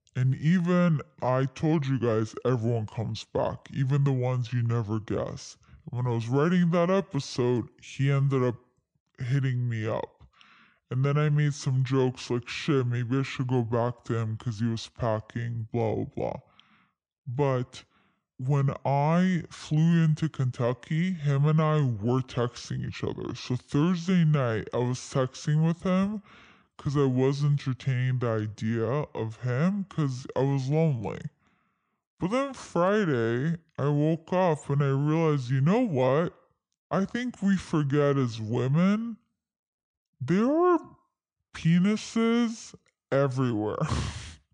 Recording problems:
wrong speed and pitch; too slow and too low; 0.7 times normal speed

